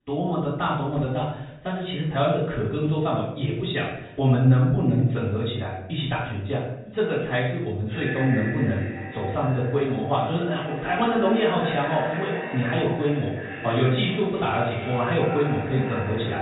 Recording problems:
echo of what is said; strong; from 8 s on; 350 ms later, 9 dB below the speech
off-mic speech; far
high frequencies cut off; severe; nothing above 4 kHz
room echo; noticeable; dies away in 0.7 s

